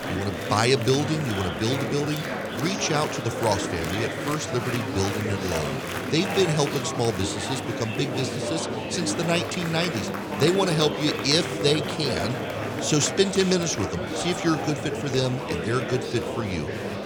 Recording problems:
murmuring crowd; loud; throughout; 4 dB below the speech

